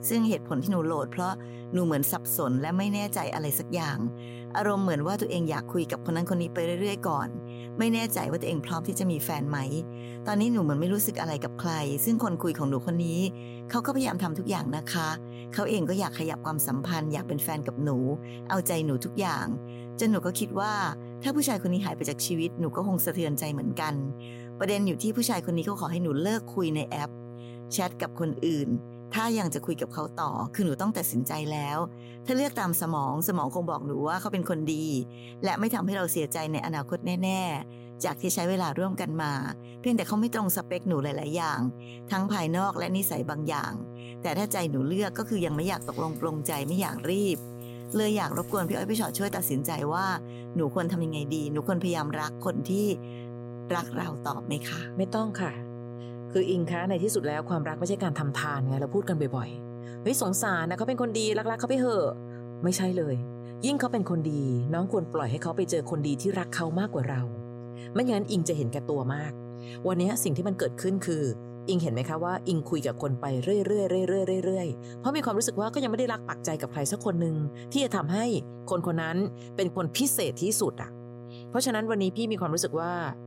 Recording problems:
electrical hum; noticeable; throughout; 60 Hz, 15 dB below the speech
jangling keys; noticeable; from 45 to 49 s; peak 10 dB below the speech

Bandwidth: 16 kHz